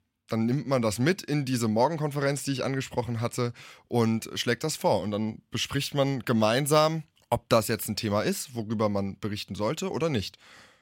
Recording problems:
none

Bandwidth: 16.5 kHz